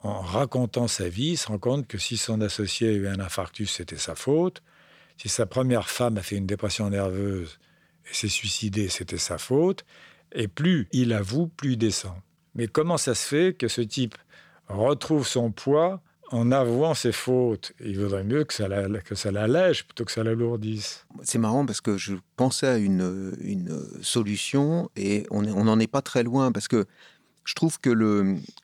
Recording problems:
none

